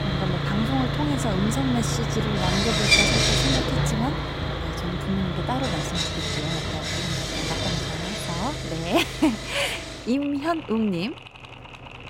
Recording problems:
machinery noise; very loud; throughout; 3 dB above the speech

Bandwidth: 16 kHz